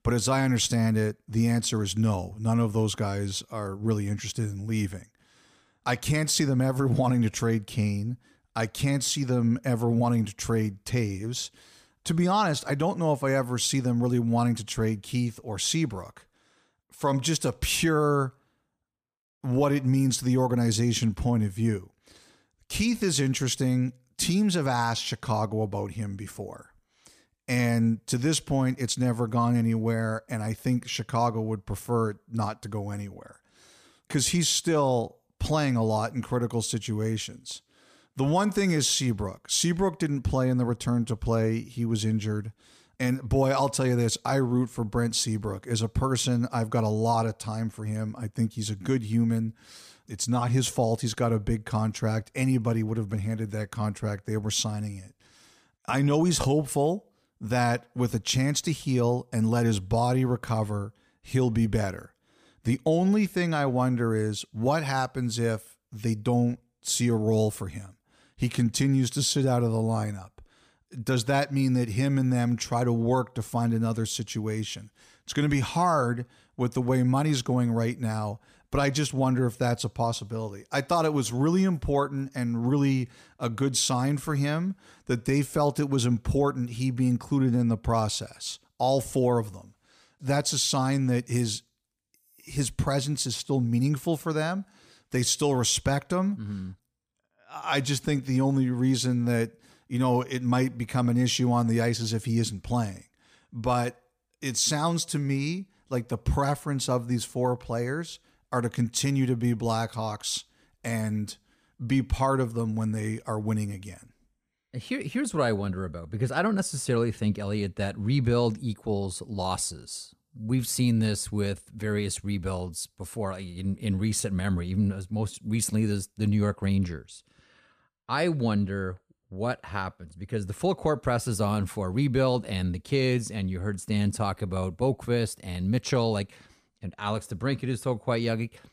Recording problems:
none

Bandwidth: 15 kHz